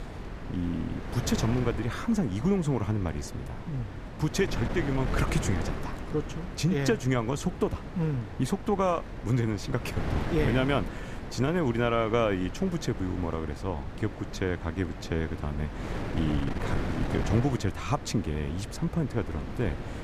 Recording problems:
wind noise on the microphone; heavy; 8 dB below the speech

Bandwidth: 14.5 kHz